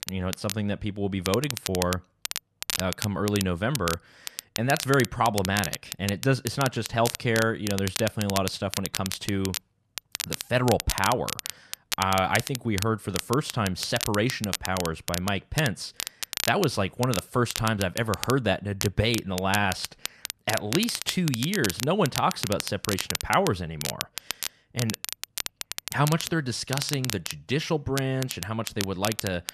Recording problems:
crackle, like an old record; loud; 6 dB below the speech

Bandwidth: 14 kHz